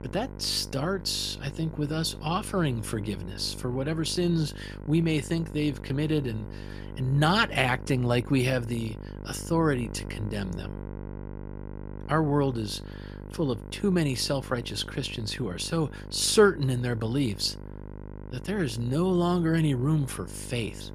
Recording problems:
electrical hum; noticeable; throughout; 50 Hz, 15 dB below the speech

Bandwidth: 15 kHz